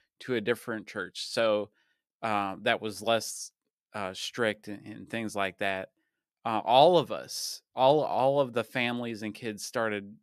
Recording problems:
none

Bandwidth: 14.5 kHz